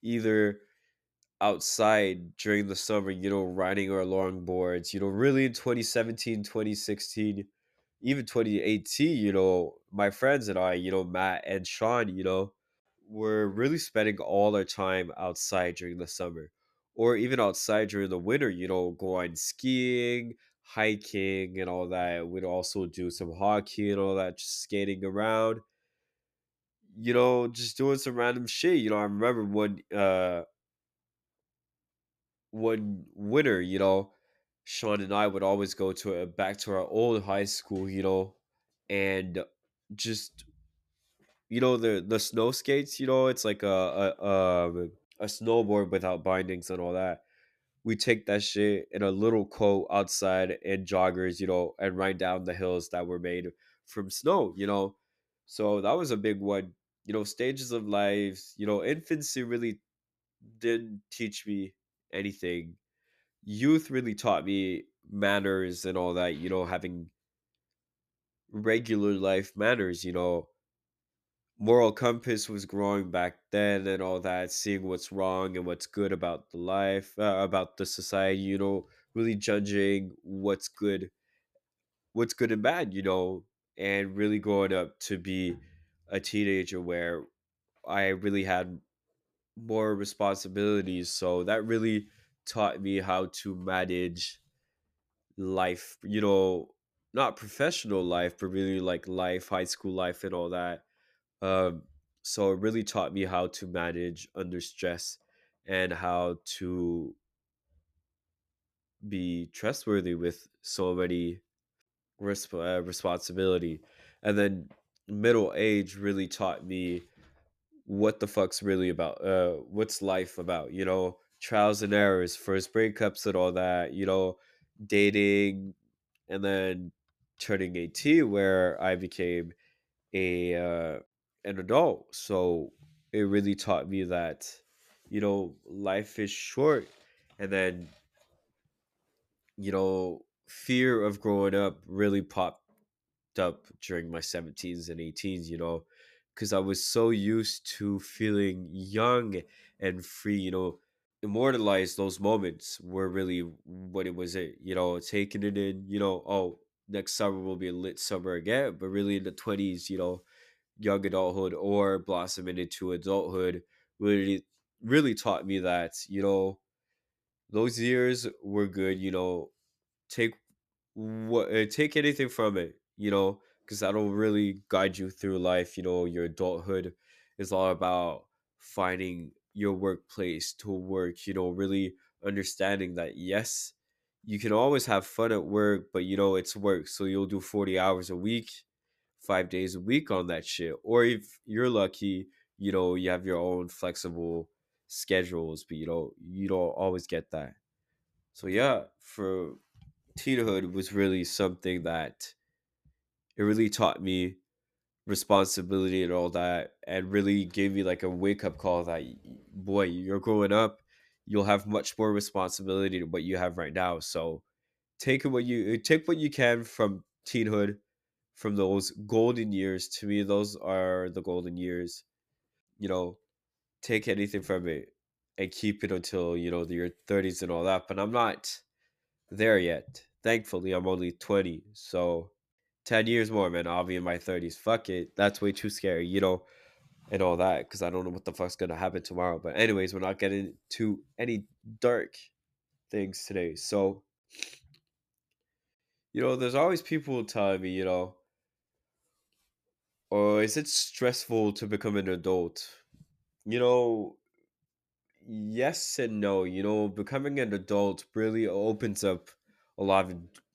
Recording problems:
none

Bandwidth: 14.5 kHz